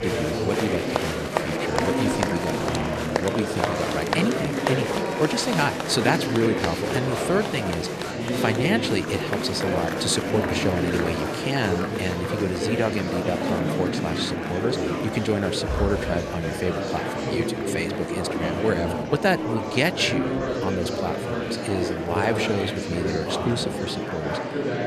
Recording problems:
murmuring crowd; very loud; throughout; 1 dB above the speech

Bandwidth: 13.5 kHz